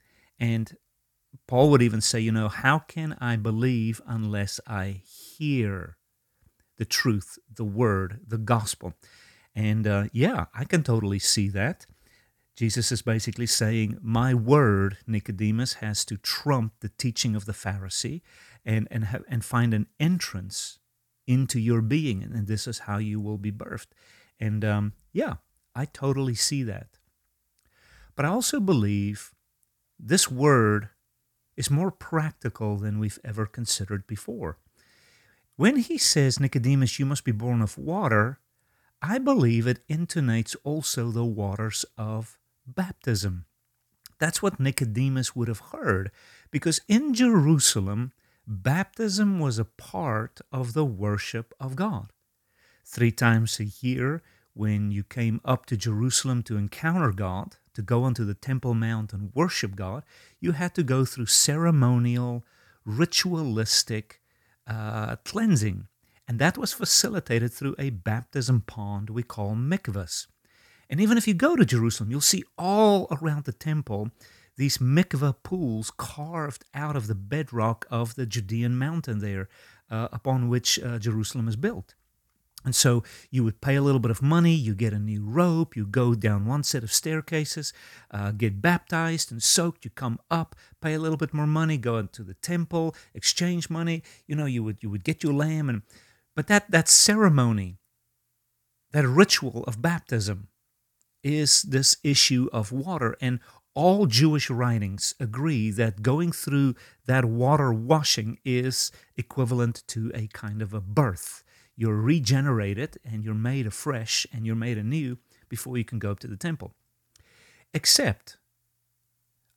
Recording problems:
none

